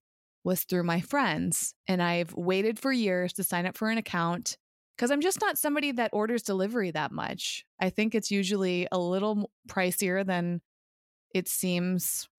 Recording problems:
none

